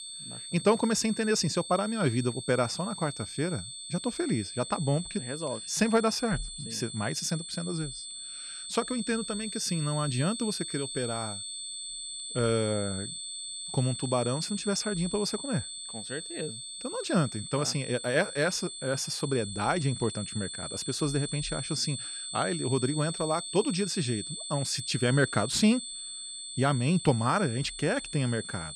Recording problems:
high-pitched whine; loud; throughout; 8 kHz, 7 dB below the speech

